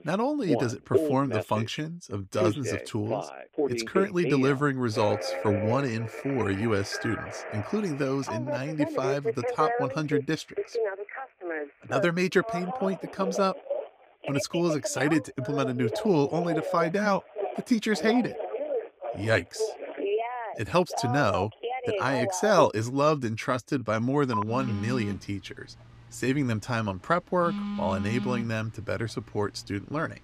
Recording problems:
alarms or sirens; loud; throughout; 5 dB below the speech

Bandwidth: 15.5 kHz